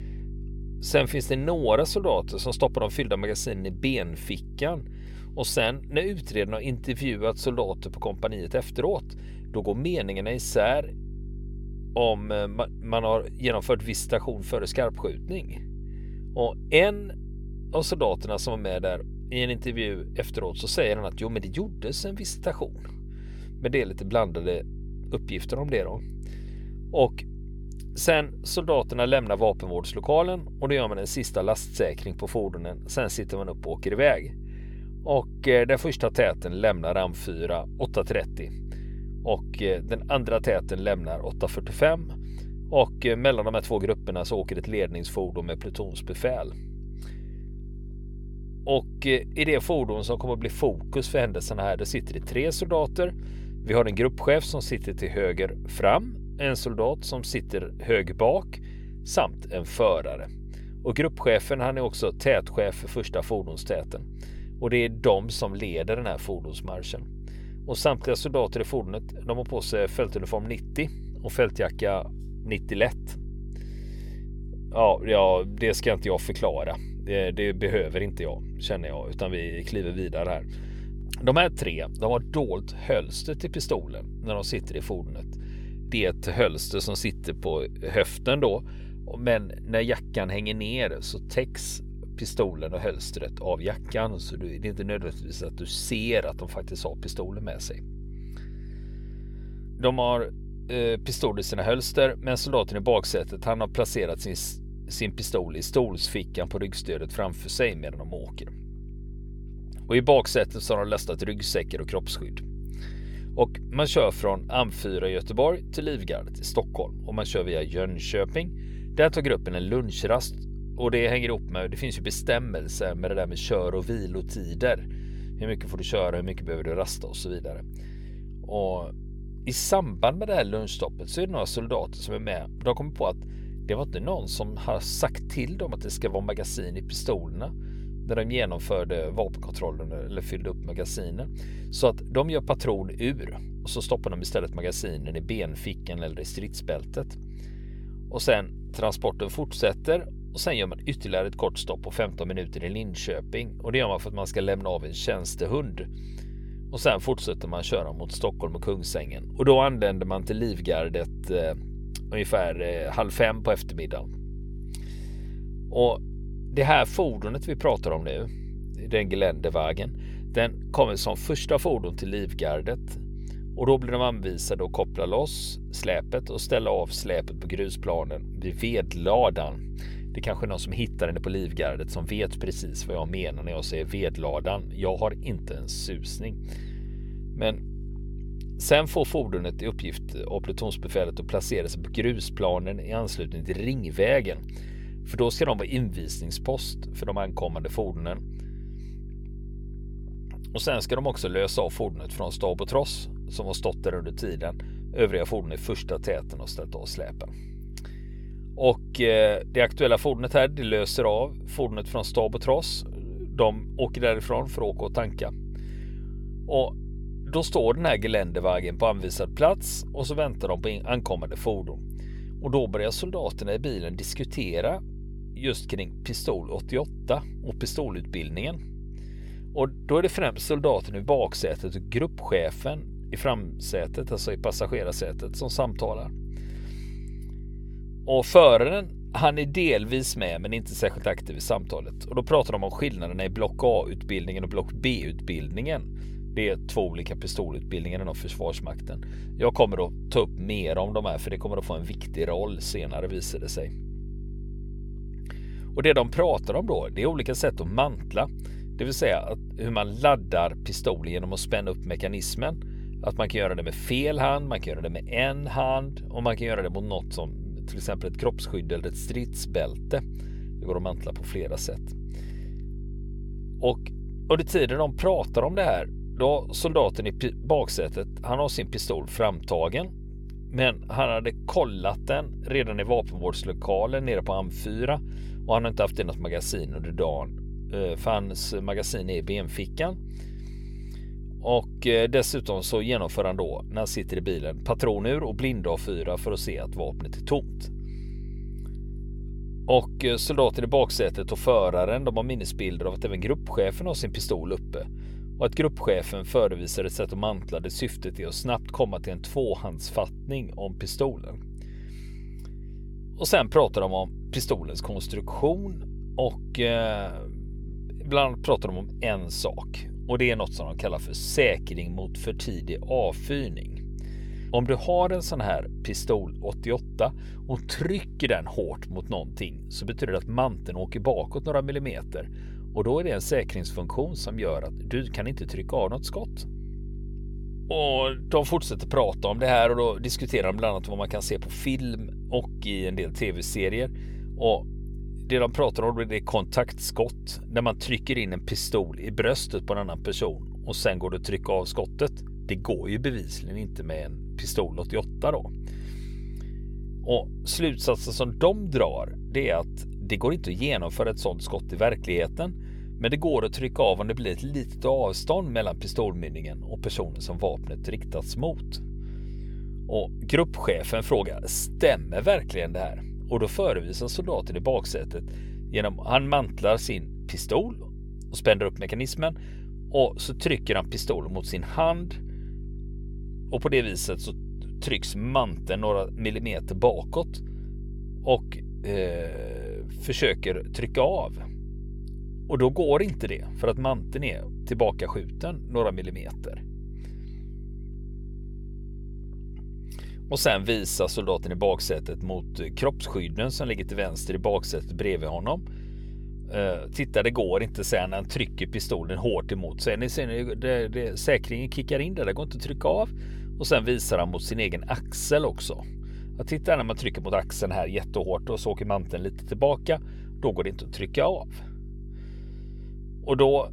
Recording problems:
electrical hum; faint; throughout; 50 Hz, 25 dB below the speech

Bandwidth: 18 kHz